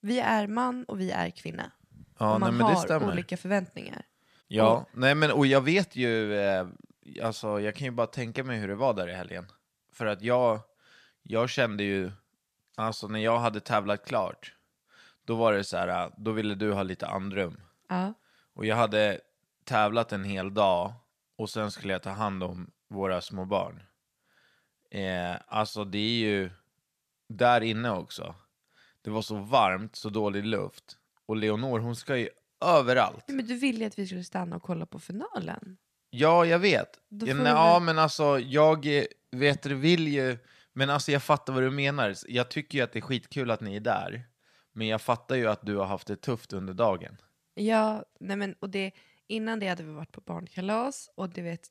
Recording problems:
none

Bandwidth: 14.5 kHz